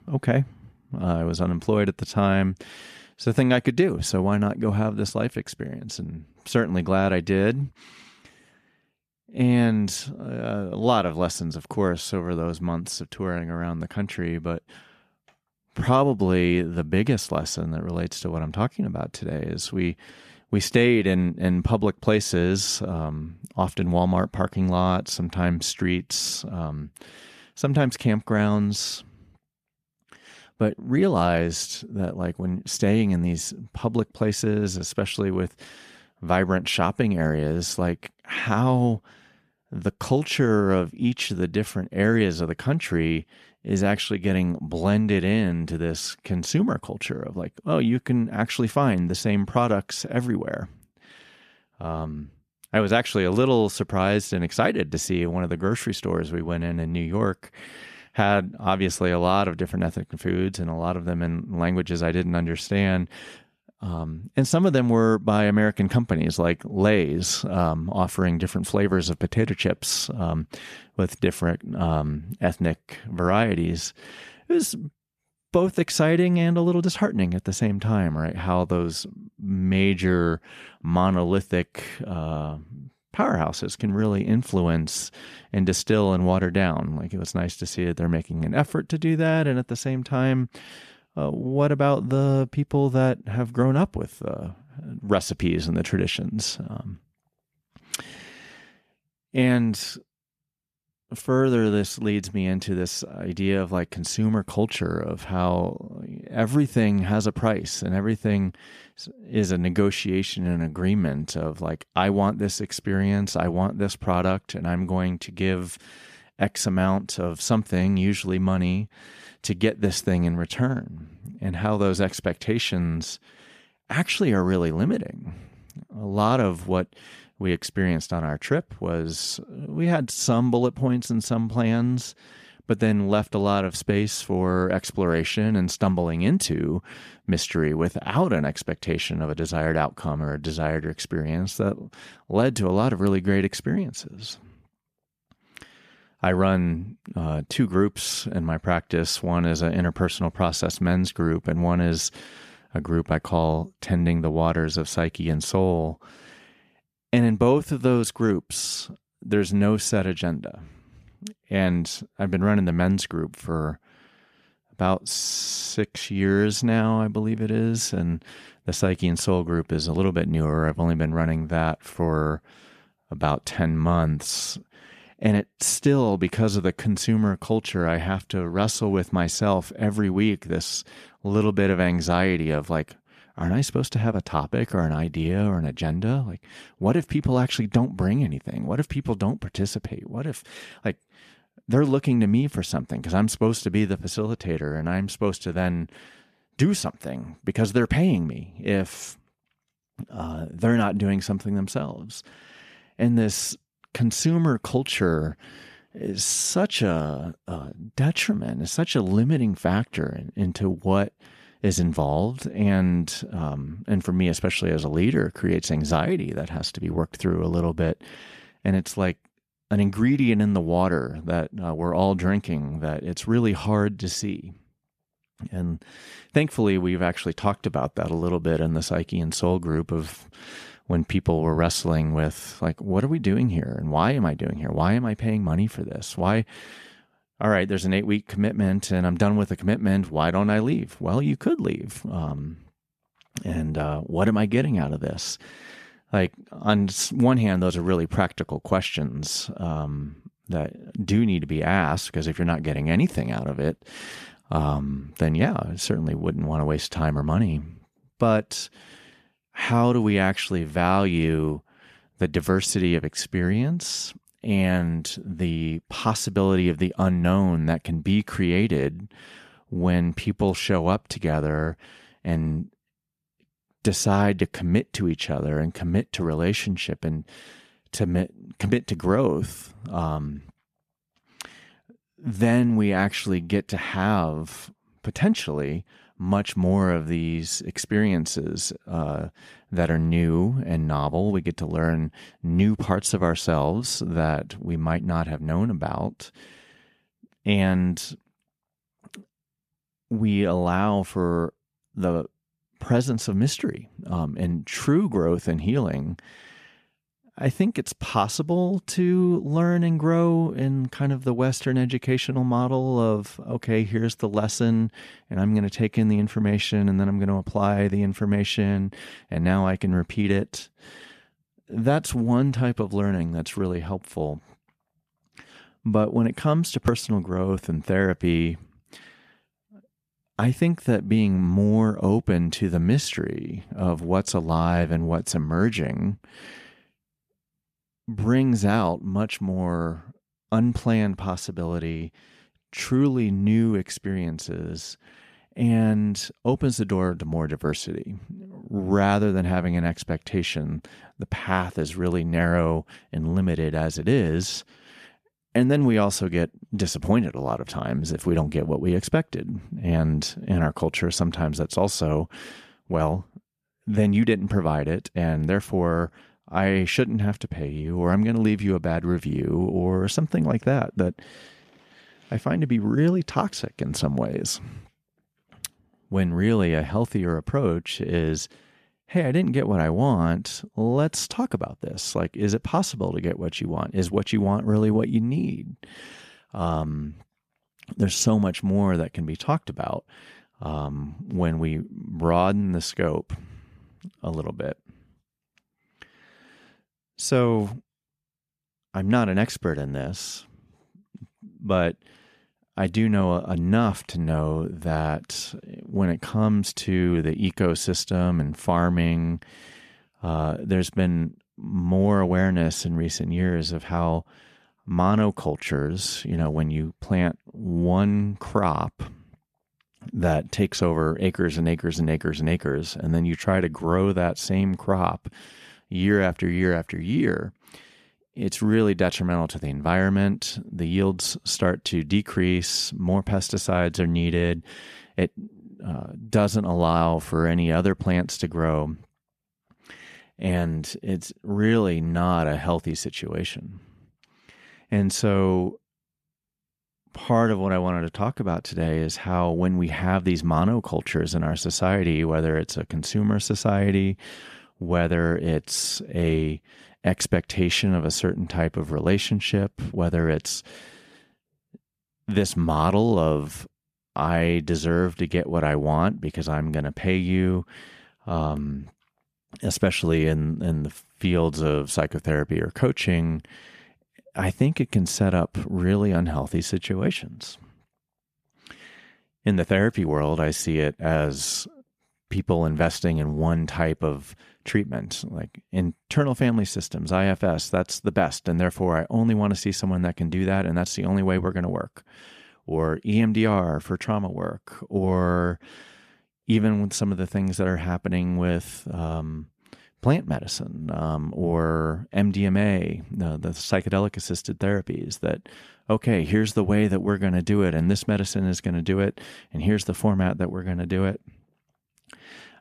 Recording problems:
none

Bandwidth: 14.5 kHz